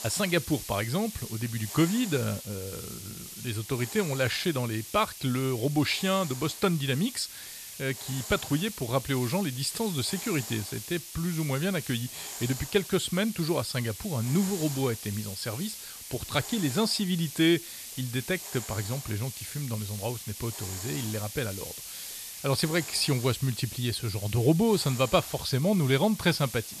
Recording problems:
hiss; loud; throughout; 9 dB below the speech

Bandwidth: 14 kHz